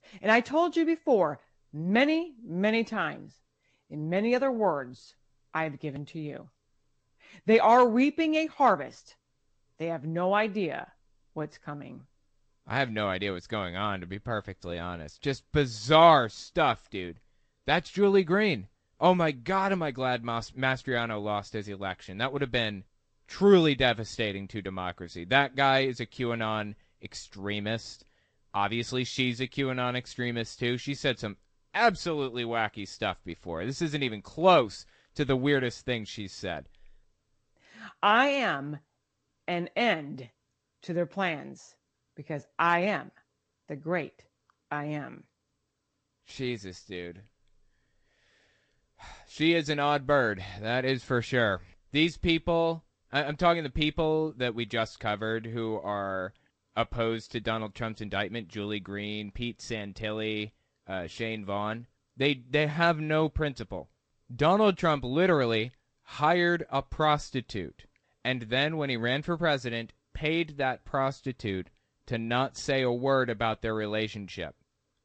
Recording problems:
garbled, watery; slightly; nothing above 8 kHz

